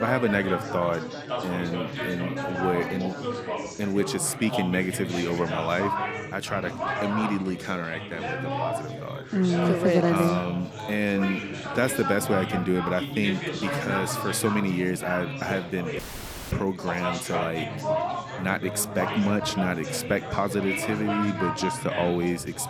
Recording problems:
chatter from many people; loud; throughout; 4 dB below the speech
abrupt cut into speech; at the start
audio cutting out; at 16 s for 0.5 s

